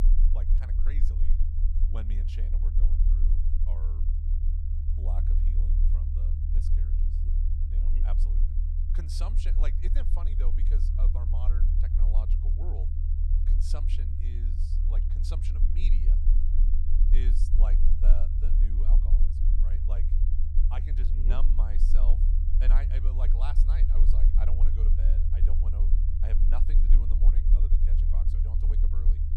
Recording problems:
low rumble; loud; throughout; 1 dB below the speech

